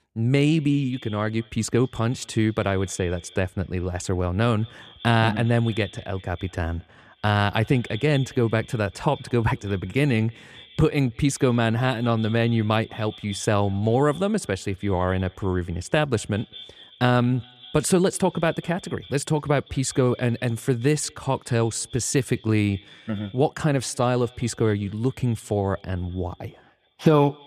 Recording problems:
echo of what is said; faint; throughout; 200 ms later, 20 dB below the speech

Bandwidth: 14.5 kHz